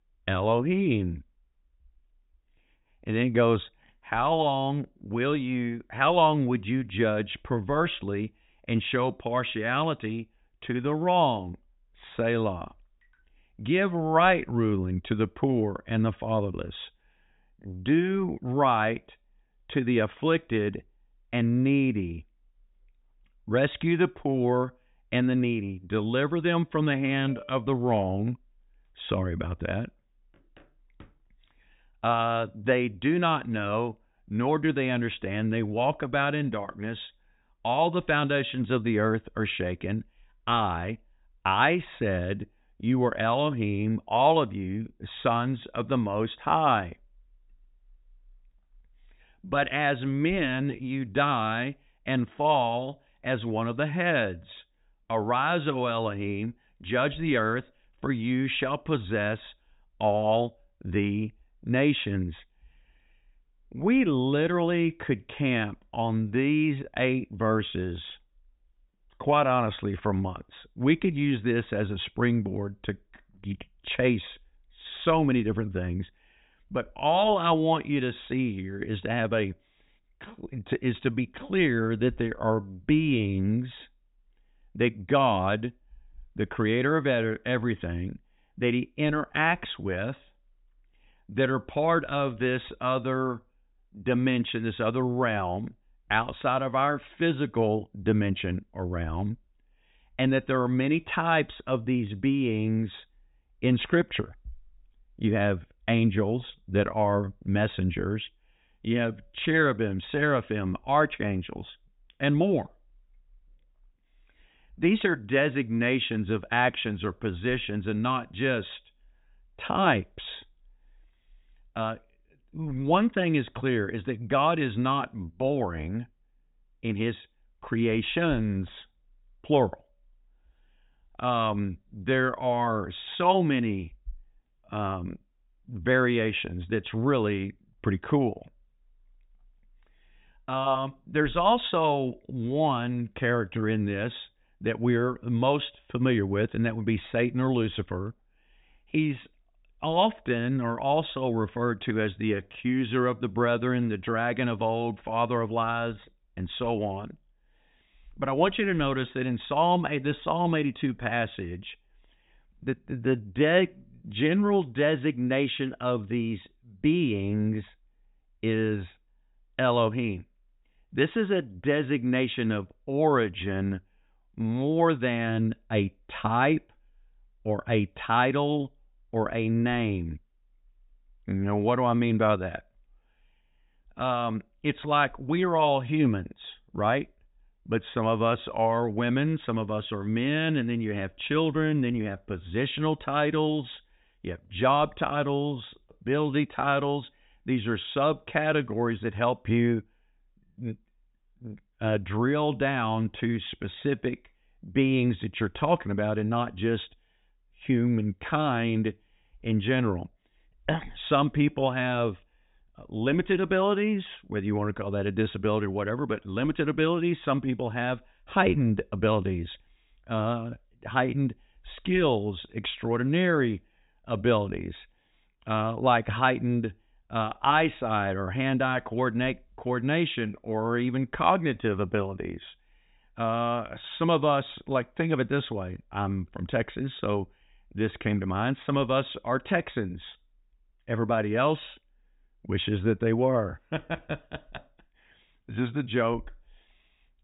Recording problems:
high frequencies cut off; severe; nothing above 4 kHz

